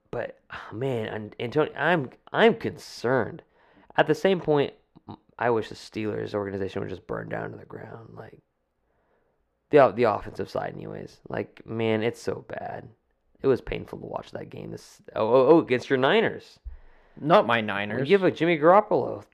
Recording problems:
muffled; slightly; fading above 3.5 kHz

